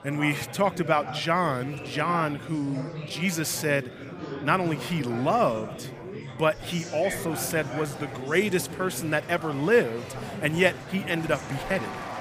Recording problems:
murmuring crowd; noticeable; throughout; 10 dB below the speech

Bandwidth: 15 kHz